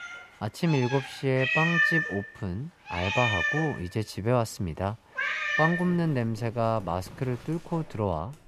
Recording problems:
animal sounds; very loud; throughout; 1 dB above the speech

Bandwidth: 14.5 kHz